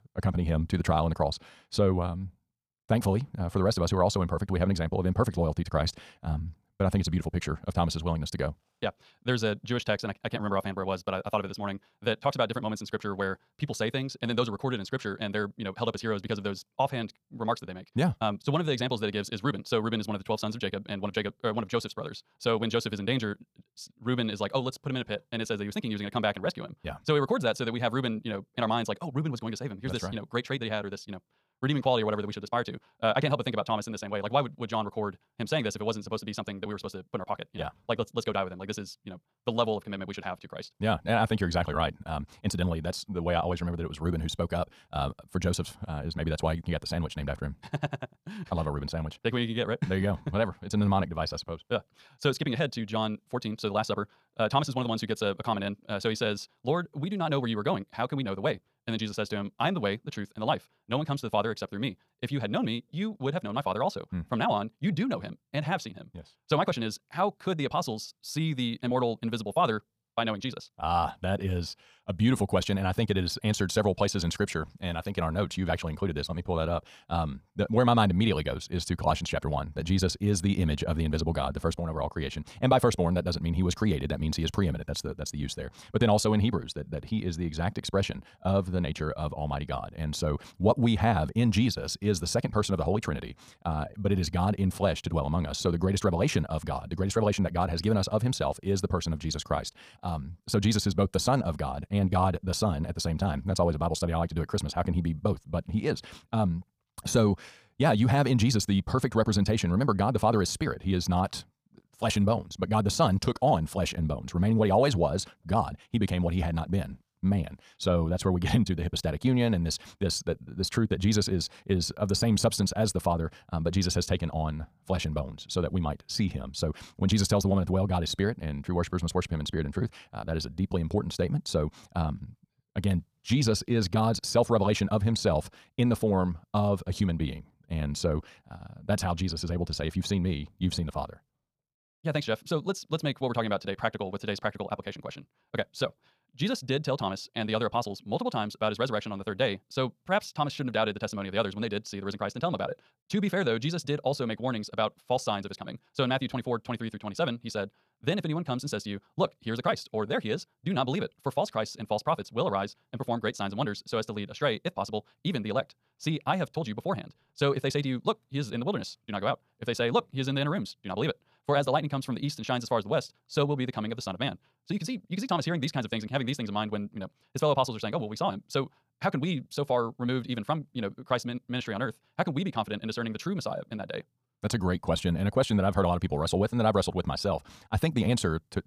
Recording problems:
wrong speed, natural pitch; too fast; 1.7 times normal speed

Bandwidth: 15 kHz